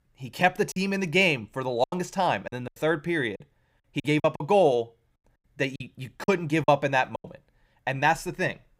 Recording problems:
choppy; very; from 0.5 to 3 s and from 3.5 to 7 s; 13% of the speech affected

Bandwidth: 15.5 kHz